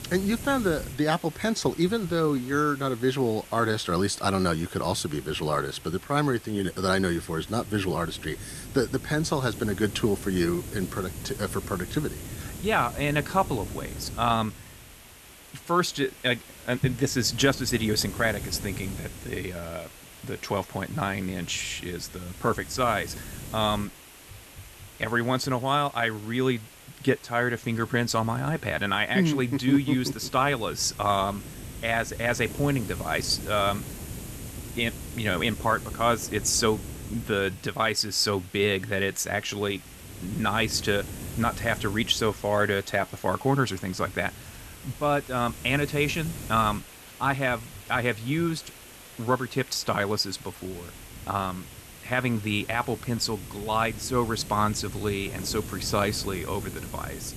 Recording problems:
hiss; noticeable; throughout; 15 dB below the speech

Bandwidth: 13.5 kHz